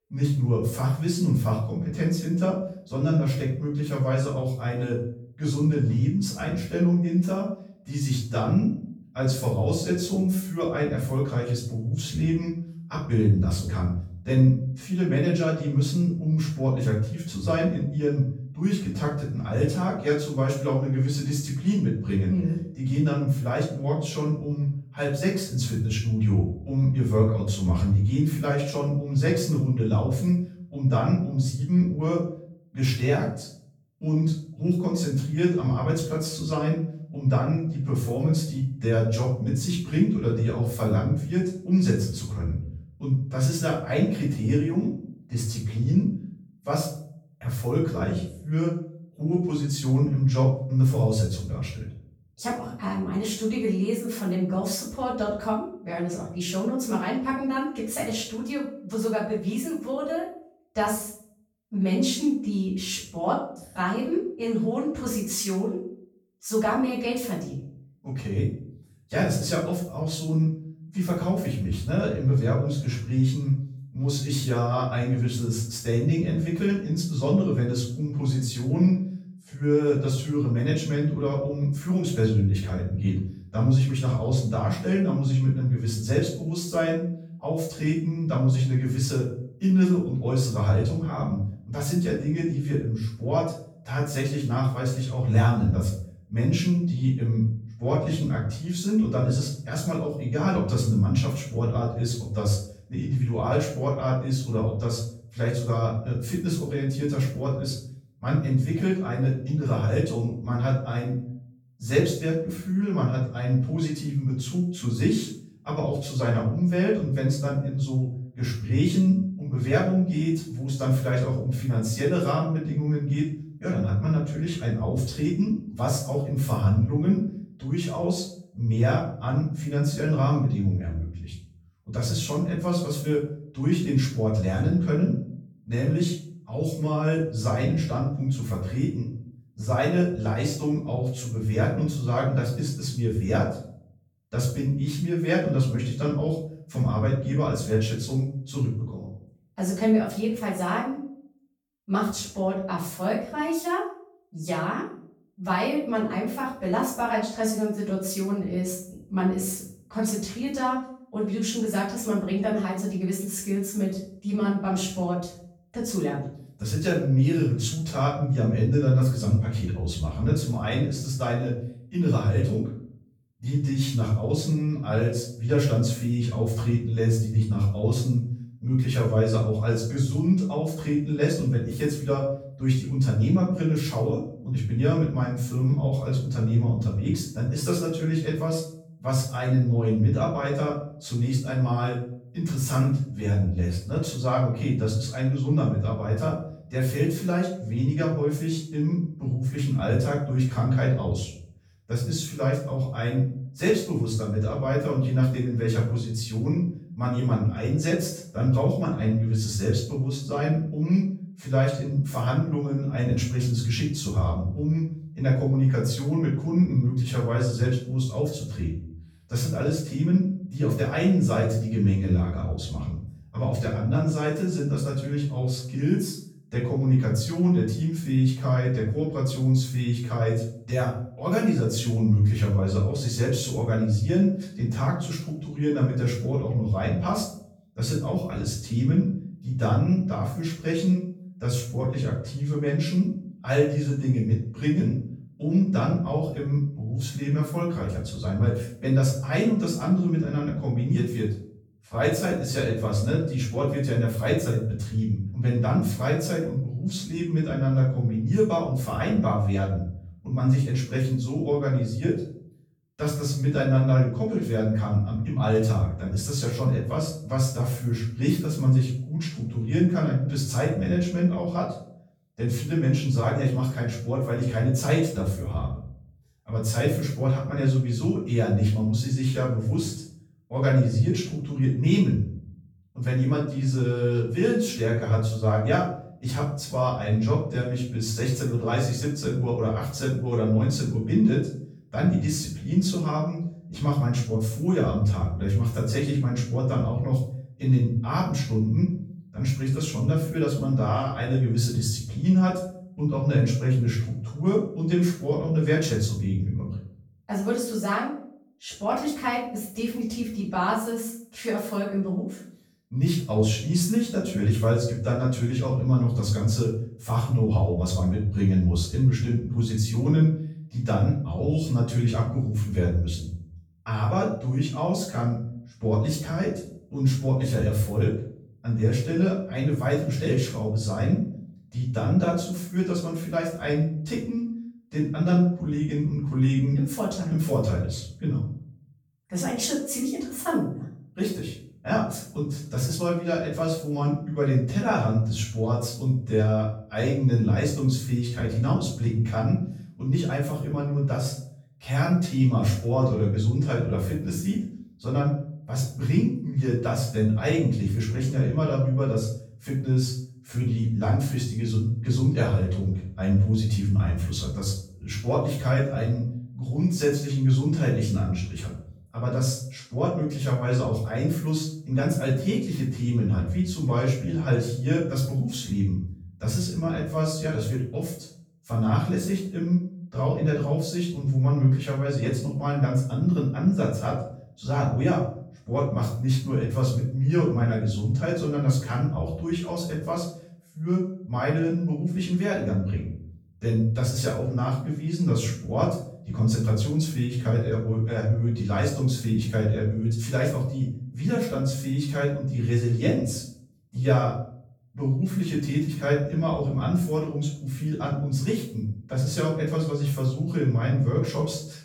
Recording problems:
off-mic speech; far
room echo; noticeable; dies away in 0.5 s

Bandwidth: 18.5 kHz